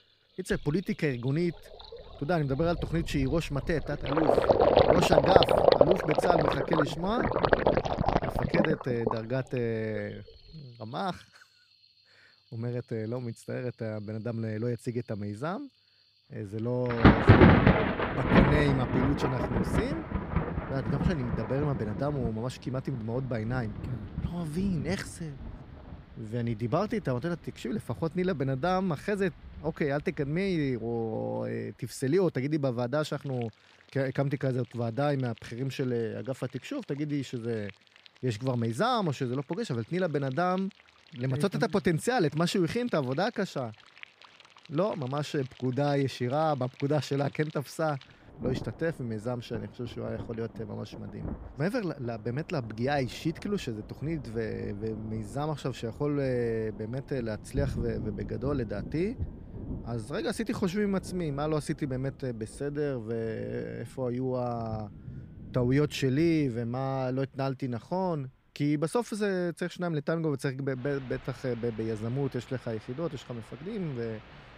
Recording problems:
rain or running water; very loud; throughout; 4 dB above the speech

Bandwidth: 15.5 kHz